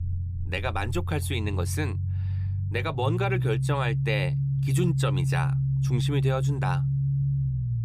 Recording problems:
low rumble; loud; throughout; 8 dB below the speech

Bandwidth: 15 kHz